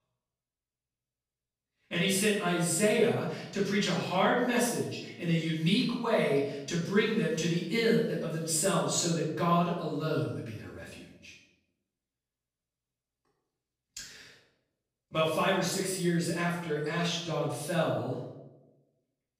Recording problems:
off-mic speech; far
room echo; noticeable; dies away in 0.8 s

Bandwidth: 15 kHz